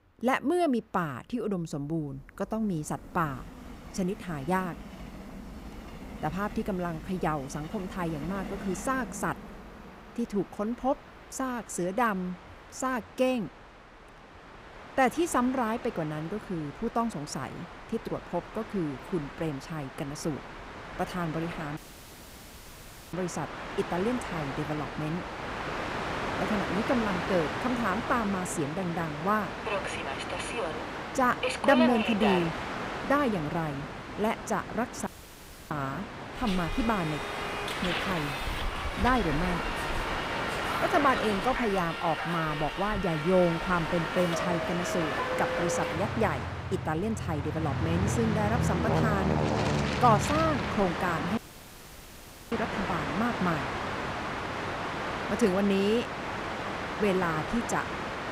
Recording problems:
train or aircraft noise; loud; throughout; 3 dB below the speech
audio cutting out; at 22 s for 1.5 s, at 35 s for 0.5 s and at 51 s for 1 s

